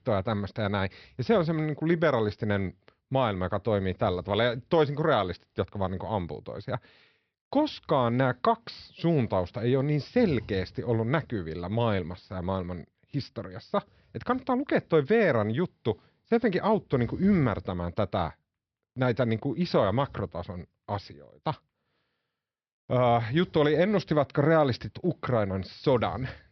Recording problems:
high frequencies cut off; noticeable; nothing above 5.5 kHz

